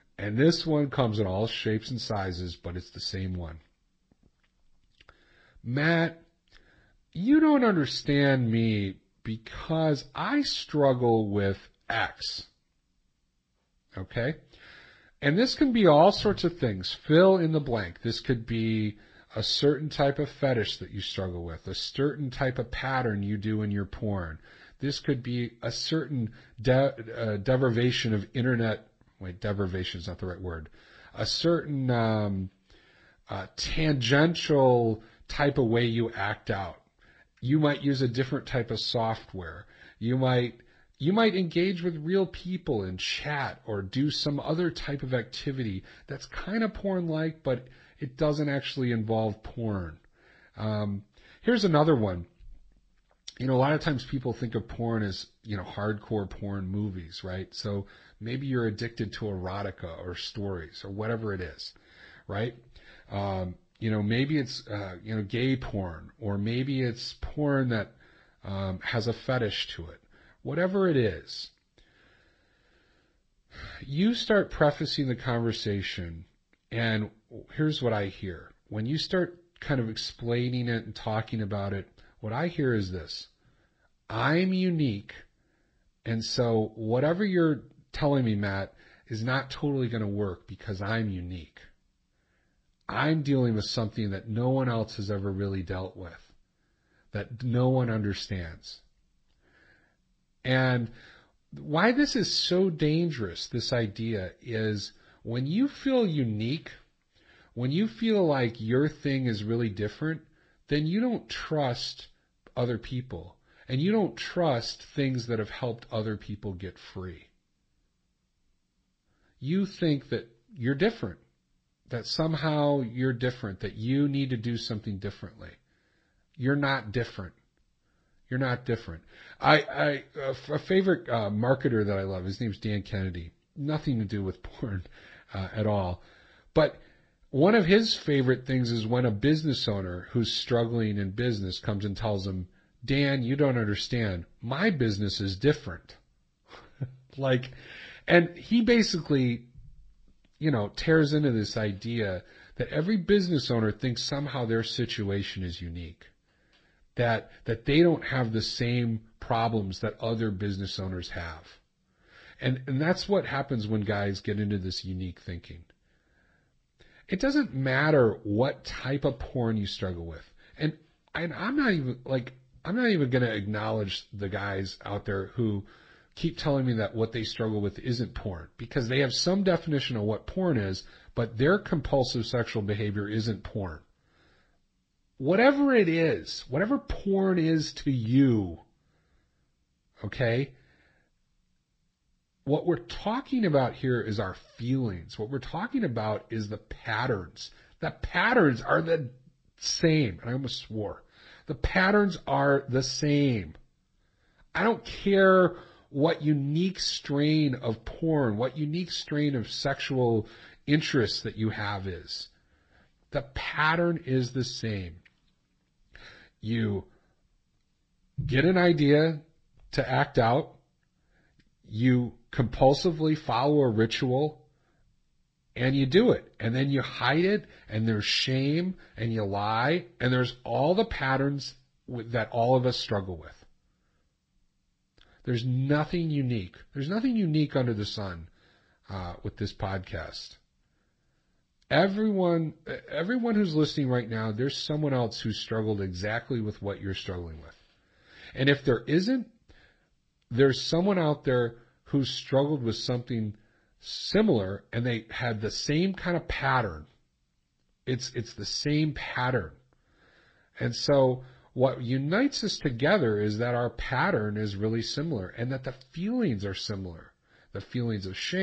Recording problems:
garbled, watery; slightly; nothing above 8 kHz
abrupt cut into speech; at the end

